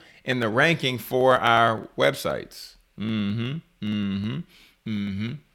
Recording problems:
none

